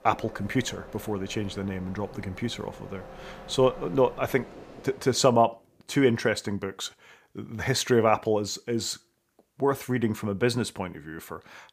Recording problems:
train or aircraft noise; noticeable; until 5 s; 20 dB below the speech

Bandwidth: 15 kHz